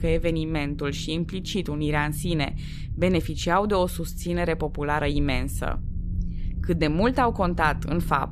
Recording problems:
low rumble; faint; throughout; 20 dB below the speech

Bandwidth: 14.5 kHz